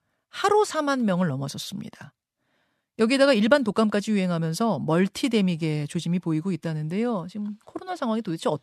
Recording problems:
none

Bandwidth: 13.5 kHz